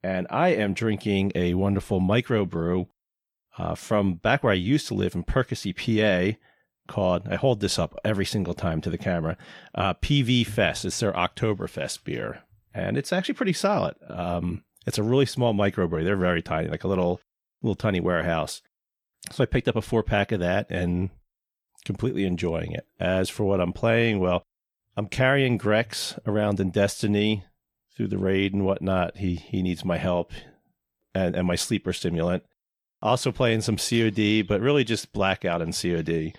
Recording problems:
none

